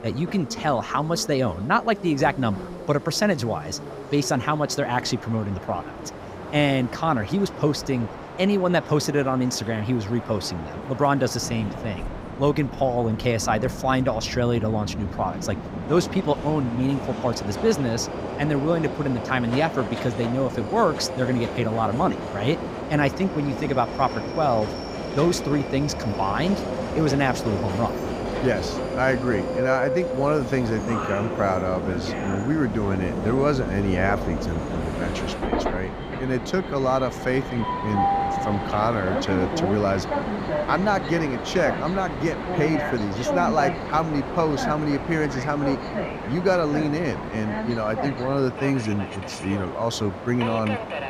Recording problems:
train or aircraft noise; loud; throughout; 6 dB below the speech

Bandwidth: 15.5 kHz